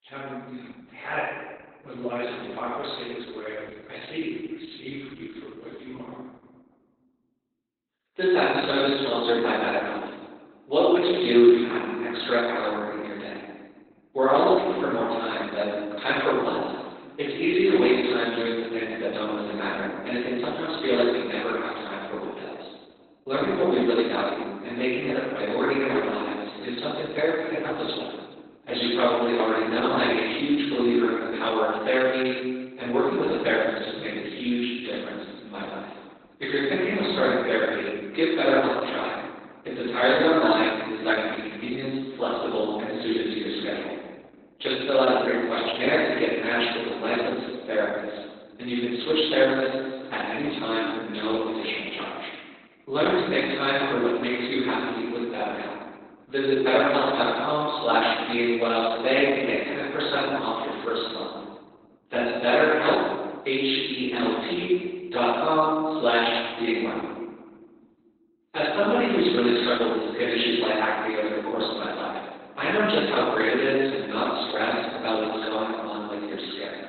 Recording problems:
room echo; strong; dies away in 1.3 s
off-mic speech; far
garbled, watery; badly; nothing above 4 kHz
thin; somewhat; fading below 350 Hz

